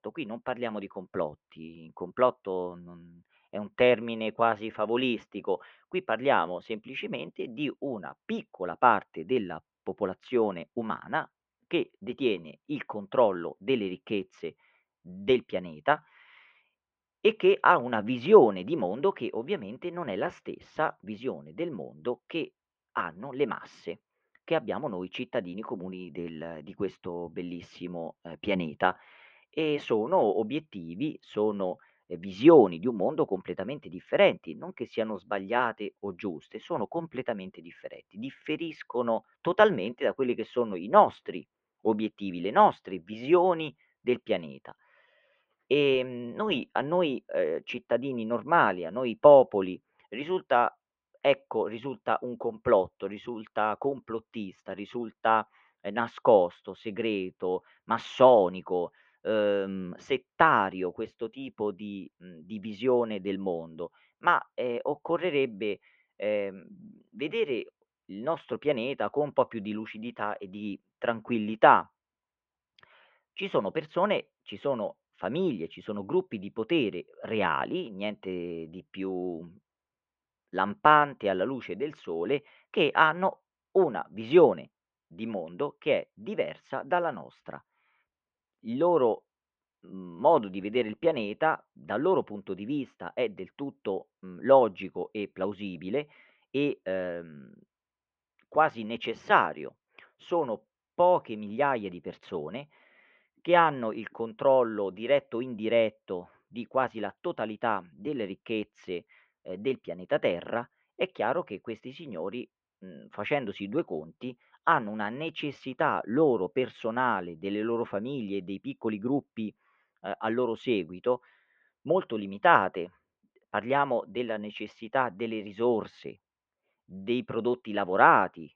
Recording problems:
muffled; very; fading above 3 kHz

